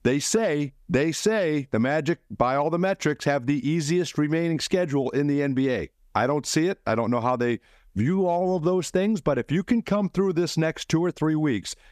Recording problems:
squashed, flat; somewhat

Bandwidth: 14.5 kHz